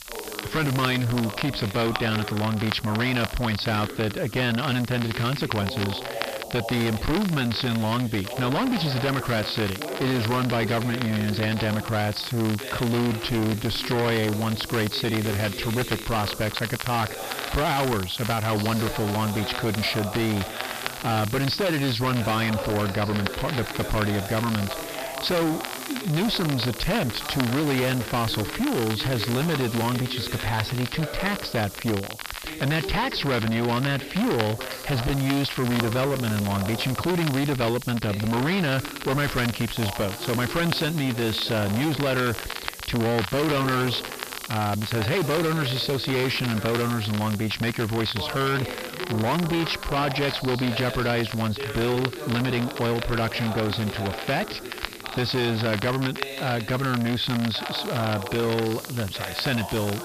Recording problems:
distortion; heavy; 24% of the sound clipped
high frequencies cut off; noticeable; nothing above 5.5 kHz
voice in the background; noticeable; throughout; 10 dB below the speech
hiss; noticeable; throughout; 15 dB below the speech
crackle, like an old record; noticeable; 10 dB below the speech

